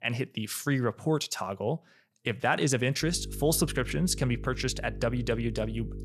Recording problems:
electrical hum; noticeable; from 3 s on; 50 Hz, 20 dB below the speech

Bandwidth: 13.5 kHz